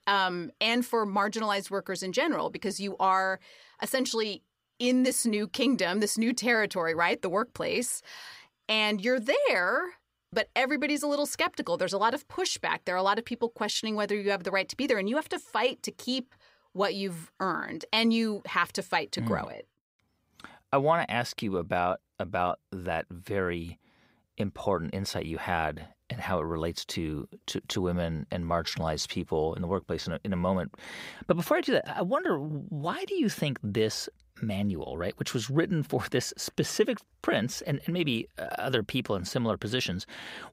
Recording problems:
none

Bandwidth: 15.5 kHz